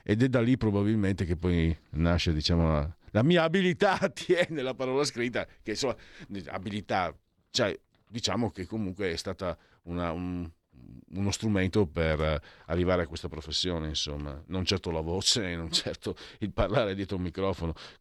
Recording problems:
none

